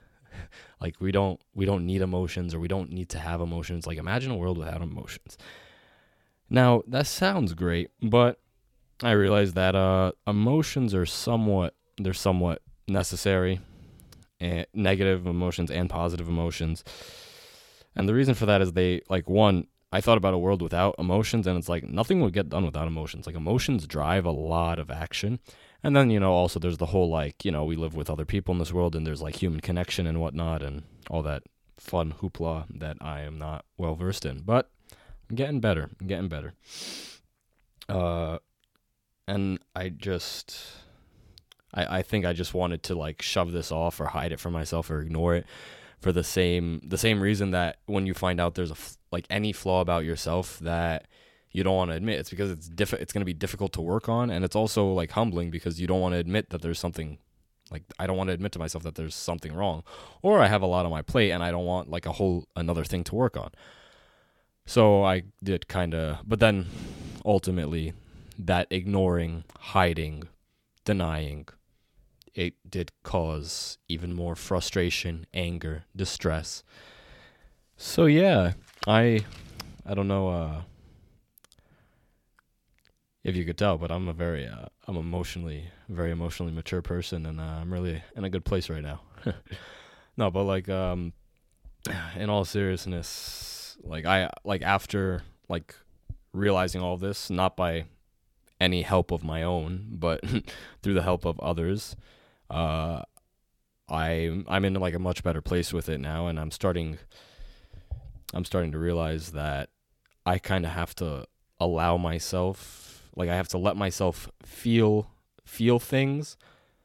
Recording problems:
none

